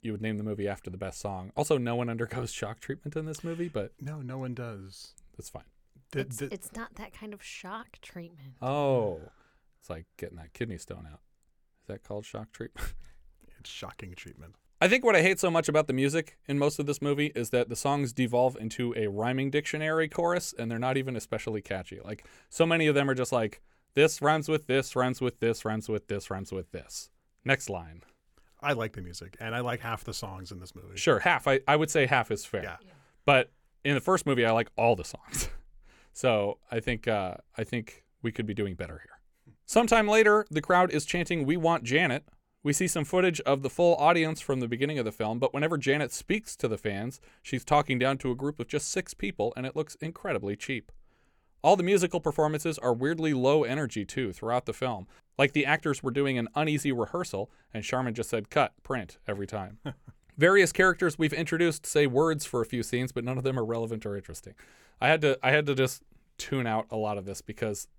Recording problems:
none

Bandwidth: 18 kHz